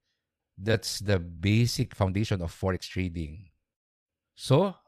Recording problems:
uneven, jittery; strongly; from 0.5 to 3.5 s

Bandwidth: 14 kHz